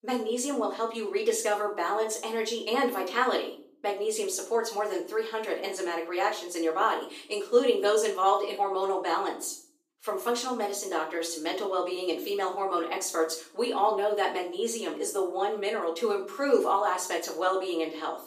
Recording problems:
off-mic speech; far
thin; somewhat; fading below 300 Hz
room echo; slight; dies away in 0.5 s

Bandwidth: 15 kHz